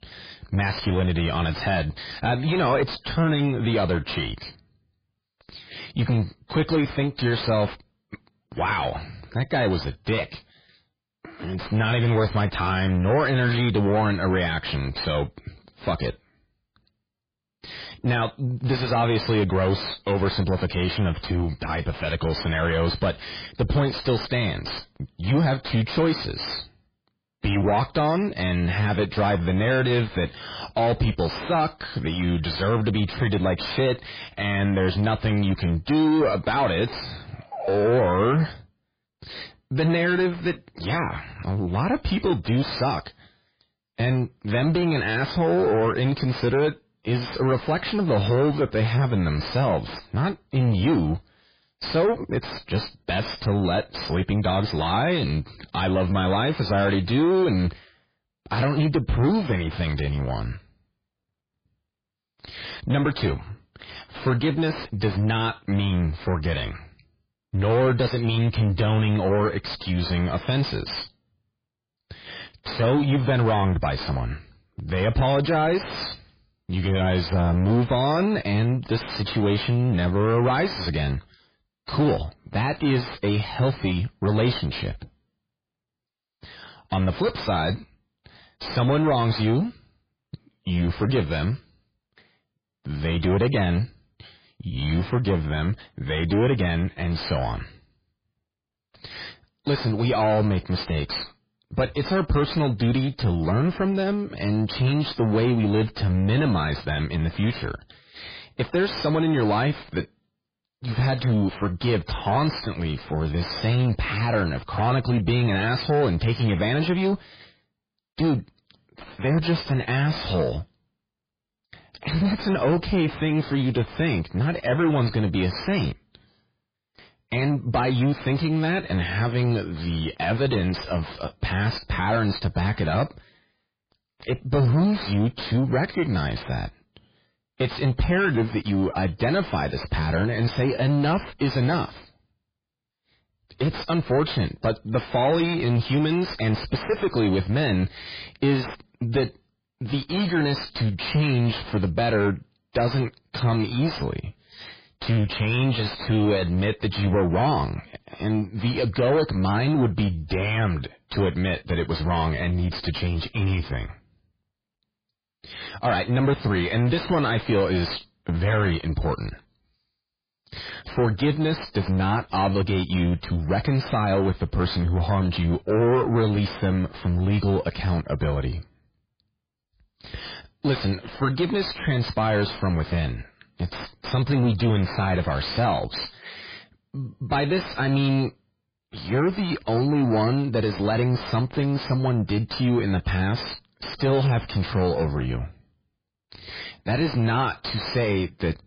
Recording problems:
distortion; heavy; 5 dB below the speech
garbled, watery; badly

